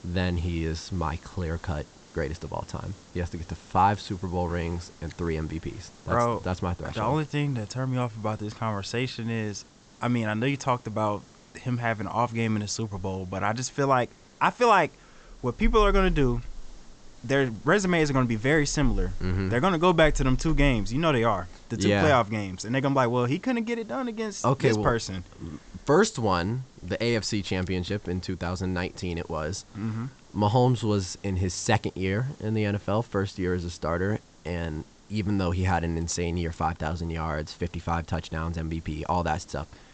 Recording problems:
high frequencies cut off; noticeable; nothing above 8 kHz
hiss; faint; throughout; 25 dB below the speech

